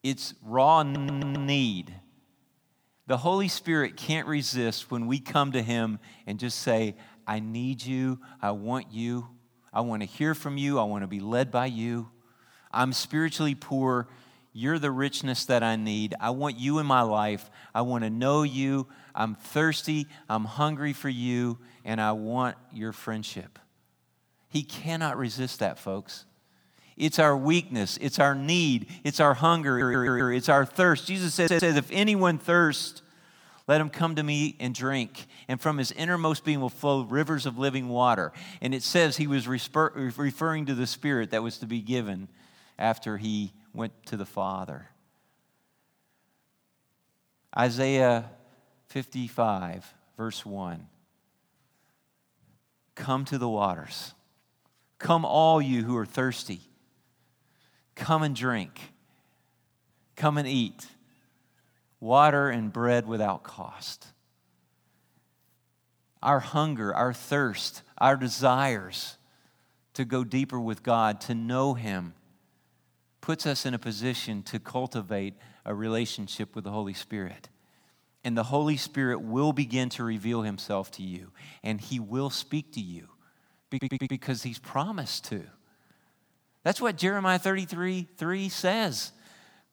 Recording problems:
audio stuttering; 4 times, first at 1 s

